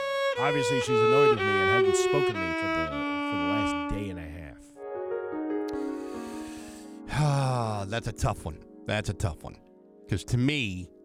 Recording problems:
background music; very loud; throughout; 4 dB above the speech

